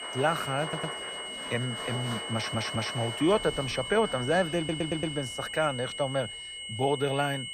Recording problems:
high-pitched whine; loud; throughout; 3 kHz, 6 dB below the speech
crowd noise; noticeable; throughout; 10 dB below the speech
audio stuttering; at 0.5 s, at 2.5 s and at 4.5 s

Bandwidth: 15 kHz